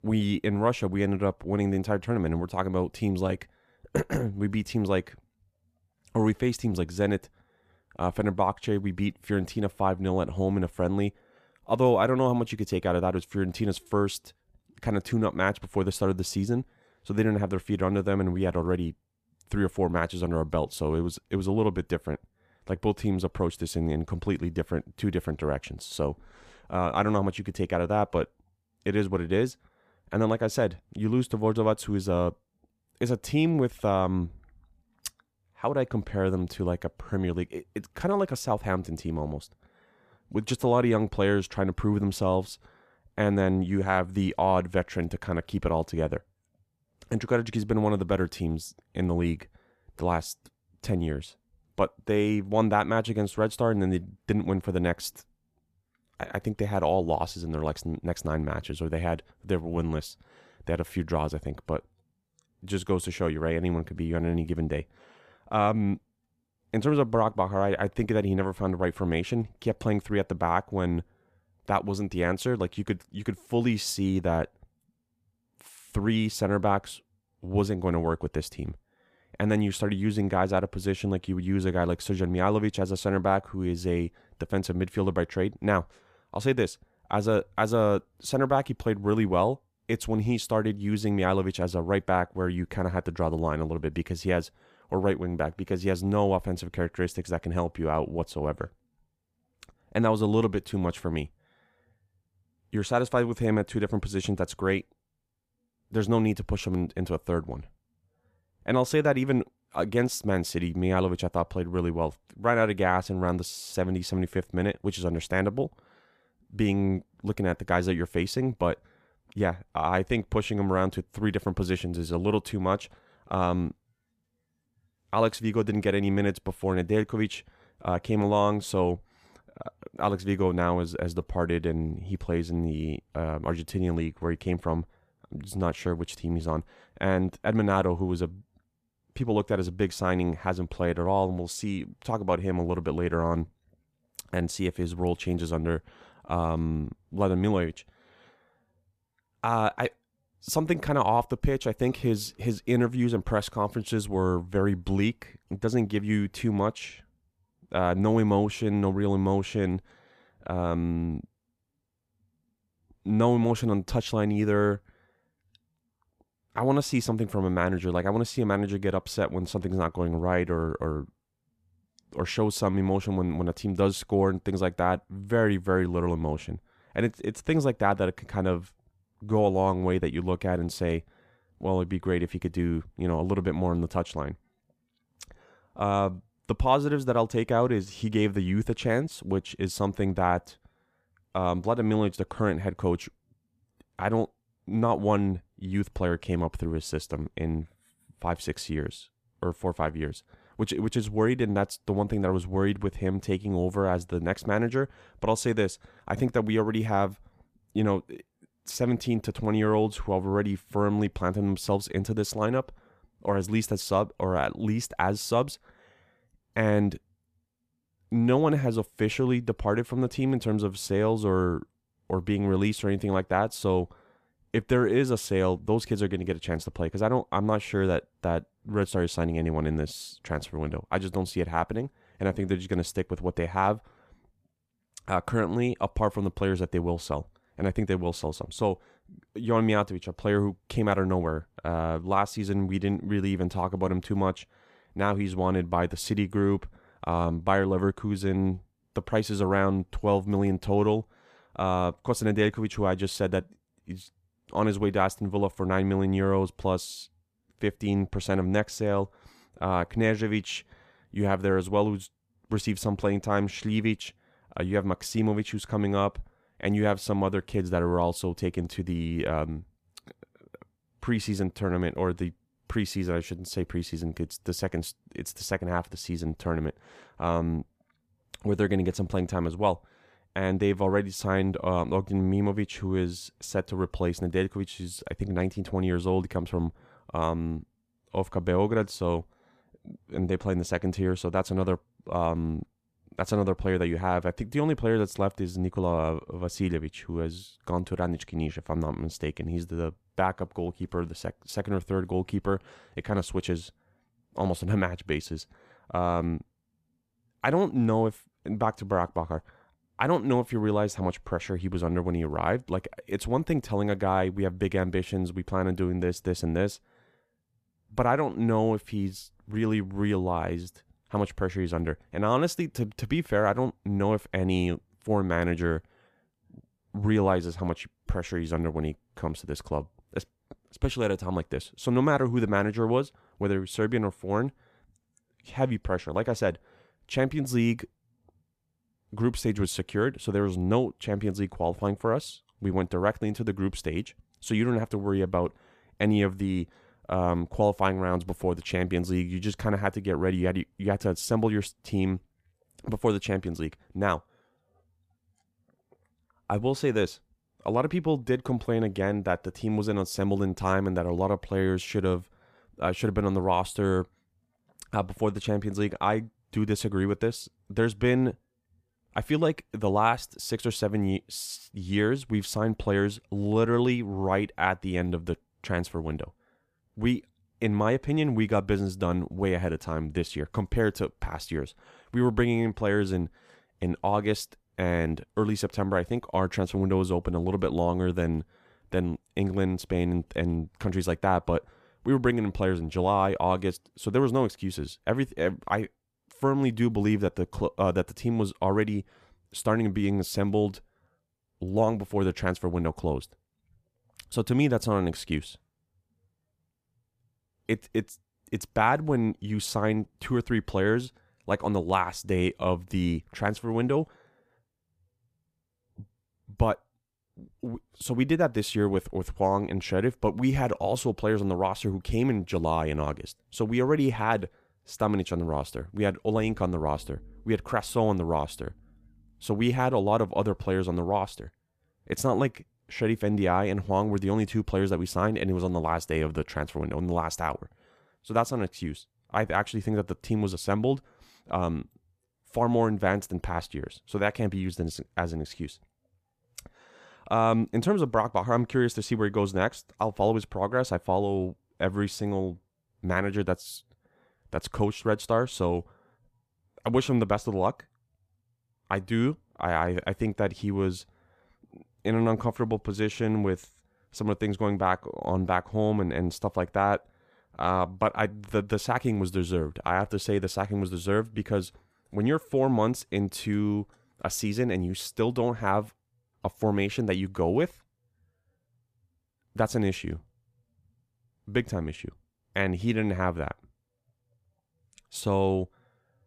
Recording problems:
none

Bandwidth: 14.5 kHz